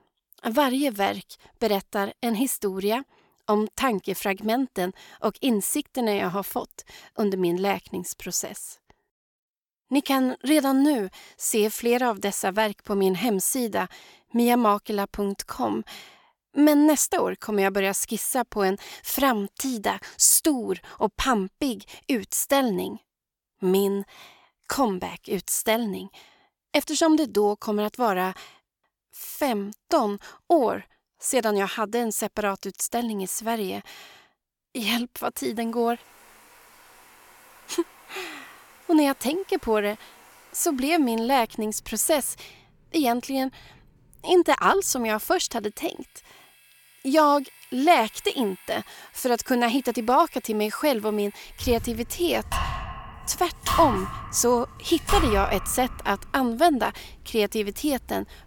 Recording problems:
household noises; noticeable; from 36 s on; 15 dB below the speech

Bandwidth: 17 kHz